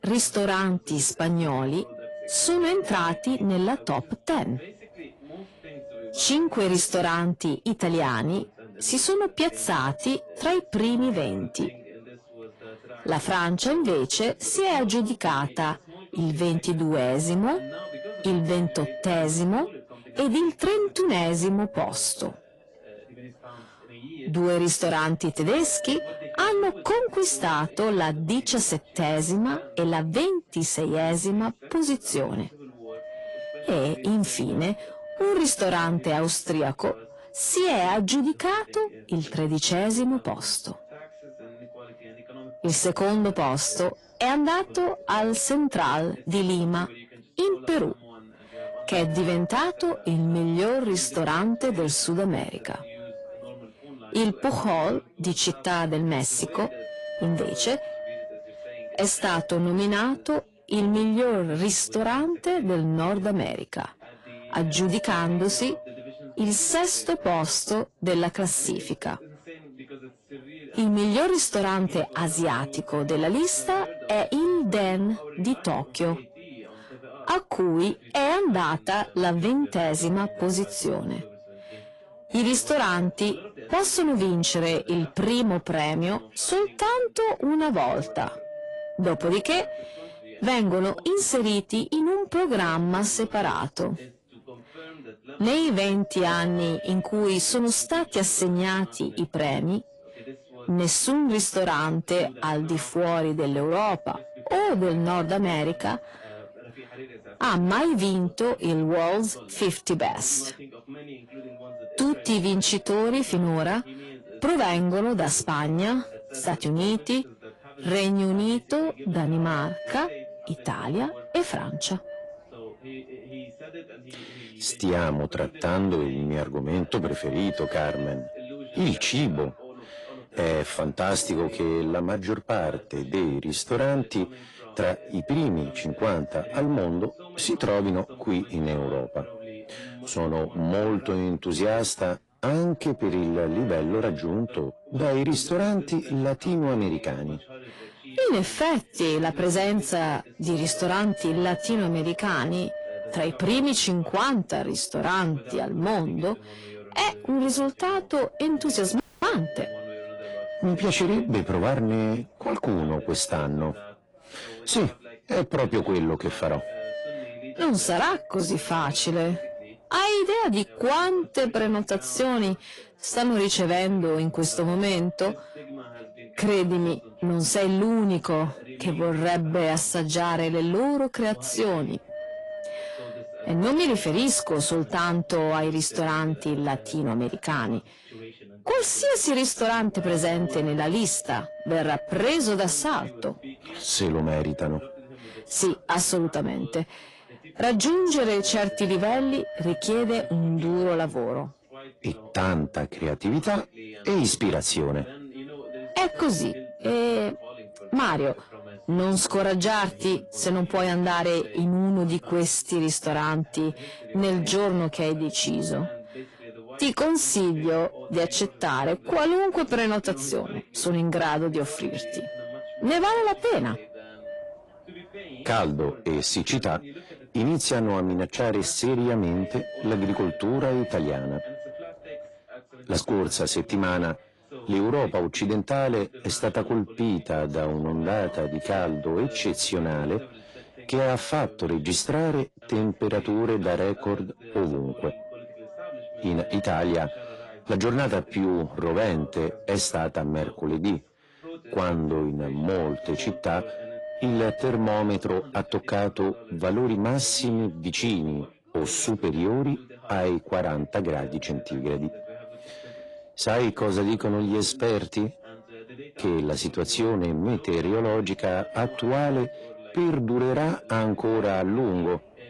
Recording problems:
distortion; slight; 10 dB below the speech
garbled, watery; slightly; nothing above 10.5 kHz
wind noise on the microphone; occasional gusts; 15 dB below the speech
background chatter; faint; throughout; 3 voices, 20 dB below the speech
audio cutting out; at 2:39

